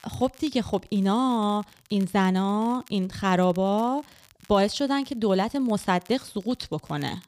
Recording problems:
crackle, like an old record; faint; 30 dB below the speech

